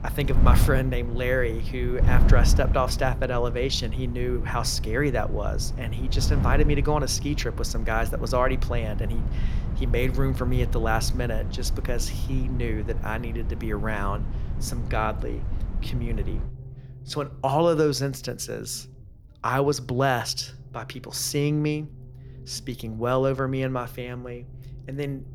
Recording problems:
wind noise on the microphone; occasional gusts; until 16 s; 15 dB below the speech
low rumble; faint; throughout; 25 dB below the speech

